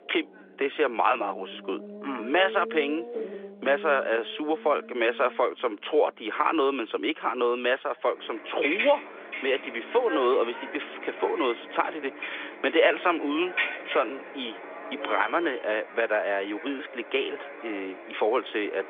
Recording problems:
phone-call audio; nothing above 3.5 kHz
traffic noise; loud; throughout; 9 dB below the speech

